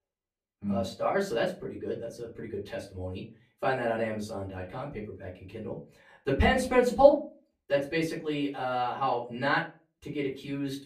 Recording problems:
off-mic speech; far
room echo; very slight; dies away in 0.3 s

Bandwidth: 14.5 kHz